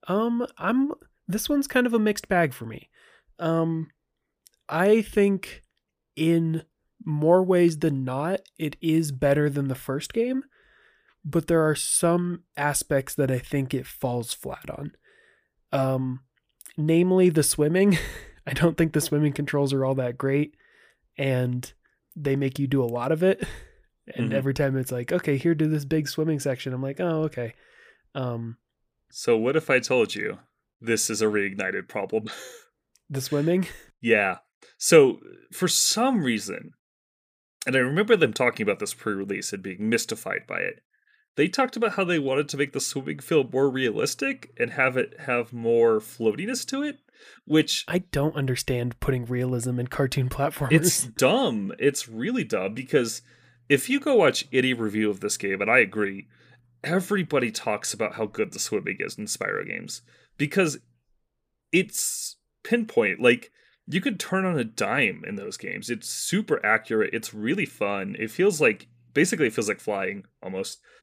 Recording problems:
none

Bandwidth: 15 kHz